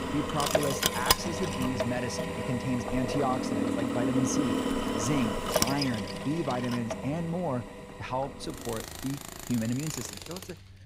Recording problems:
machinery noise; very loud; throughout; 2 dB above the speech
low rumble; faint; throughout; 25 dB below the speech

